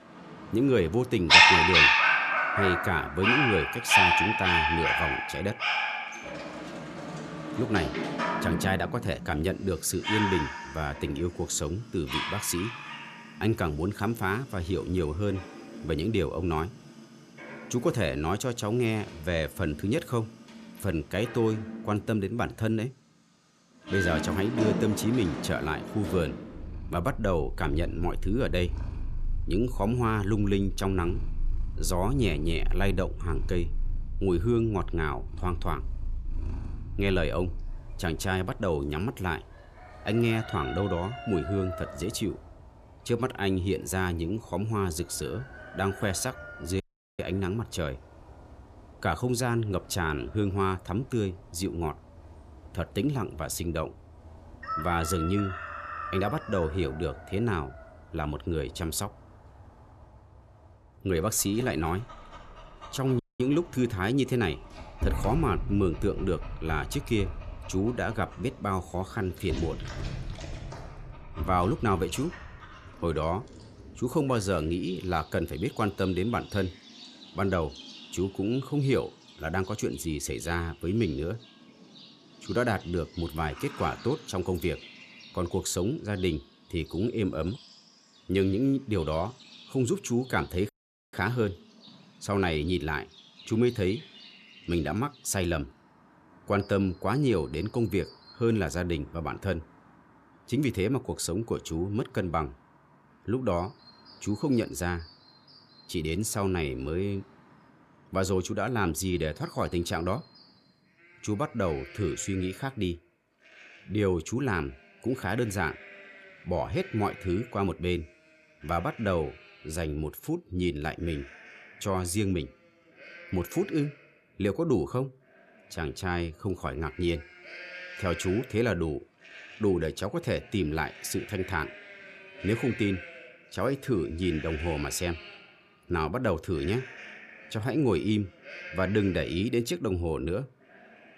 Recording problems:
animal sounds; loud; throughout; as loud as the speech
audio cutting out; at 47 s, at 1:03 and at 1:31

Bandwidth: 14 kHz